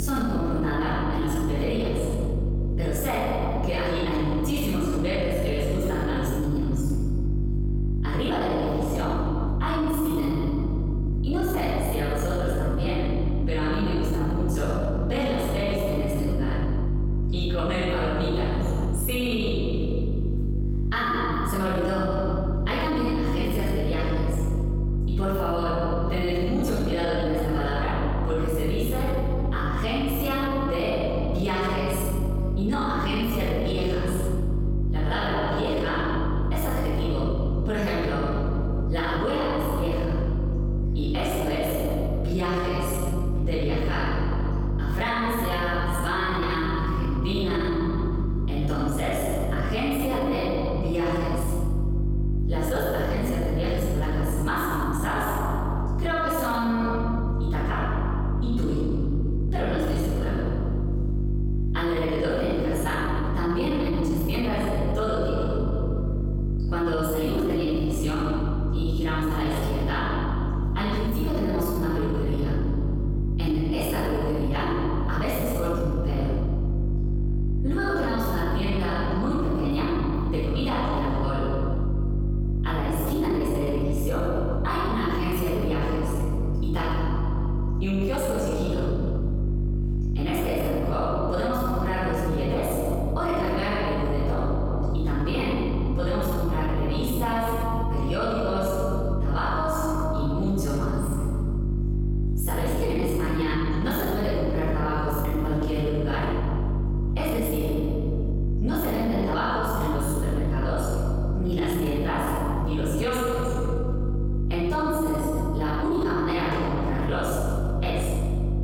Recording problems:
room echo; strong; dies away in 1.9 s
off-mic speech; far
squashed, flat; somewhat
electrical hum; noticeable; throughout; 50 Hz, 10 dB below the speech
abrupt cut into speech; at the start

